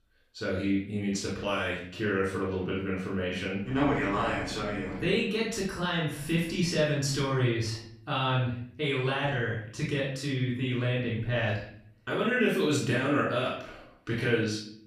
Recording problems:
off-mic speech; far
room echo; noticeable; dies away in 0.6 s

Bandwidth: 15 kHz